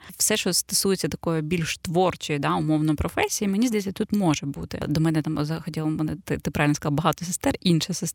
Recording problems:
none

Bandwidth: 17 kHz